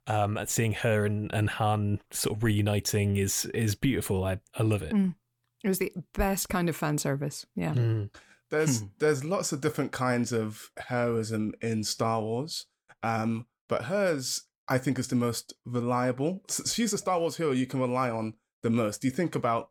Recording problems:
none

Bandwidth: 18.5 kHz